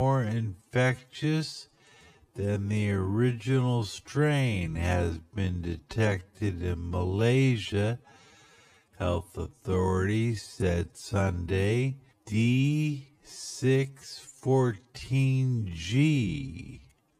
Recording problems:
wrong speed, natural pitch; too slow; 0.5 times normal speed
abrupt cut into speech; at the start

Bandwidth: 14.5 kHz